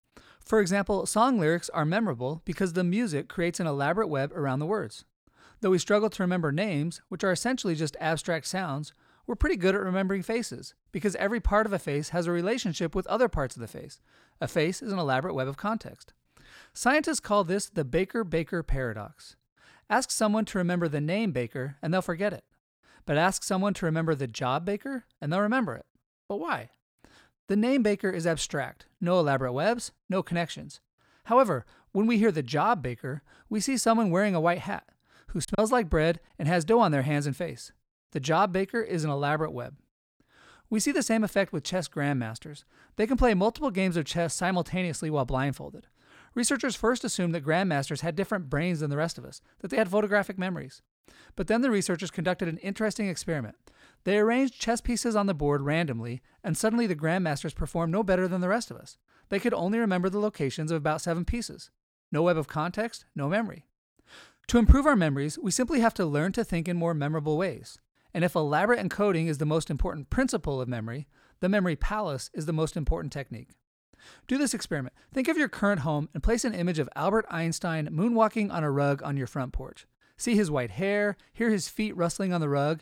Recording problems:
choppy; very; at 35 s; 7% of the speech affected

